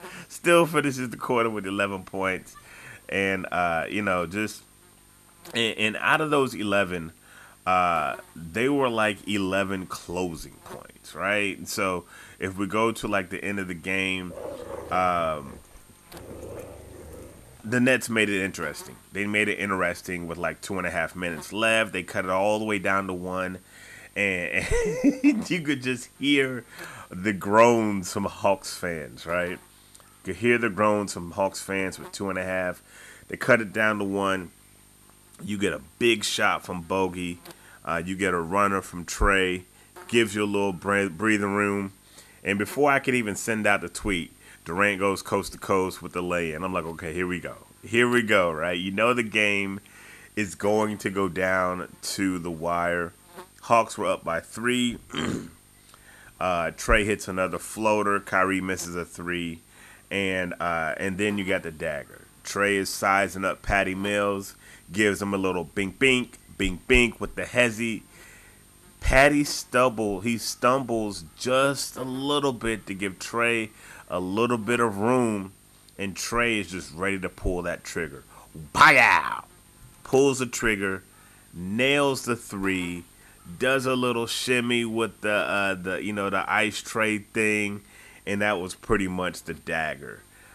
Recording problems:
electrical hum; faint; throughout; 50 Hz, 30 dB below the speech
dog barking; faint; from 14 to 18 s; peak 10 dB below the speech

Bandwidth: 13.5 kHz